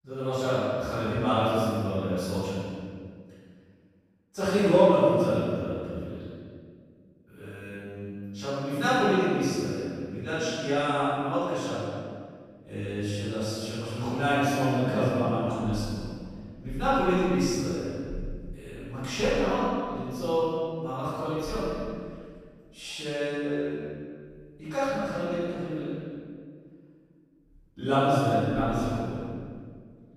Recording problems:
room echo; strong; dies away in 1.7 s
off-mic speech; far

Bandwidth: 14.5 kHz